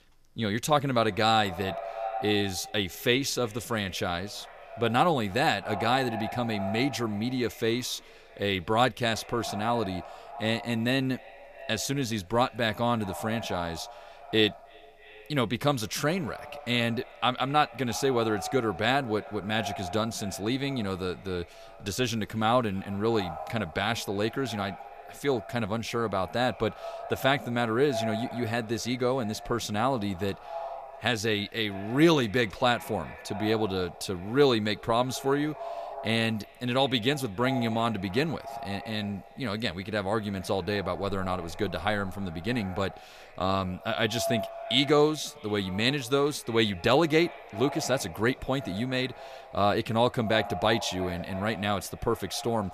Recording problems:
echo of what is said; noticeable; throughout; 310 ms later, 15 dB below the speech

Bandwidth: 14.5 kHz